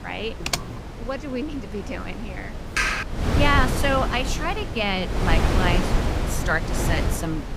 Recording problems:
wind noise on the microphone; heavy; 5 dB below the speech
keyboard typing; noticeable; at 0.5 s; peak 1 dB below the speech
keyboard typing; loud; at 3 s; peak 4 dB above the speech

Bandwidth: 15.5 kHz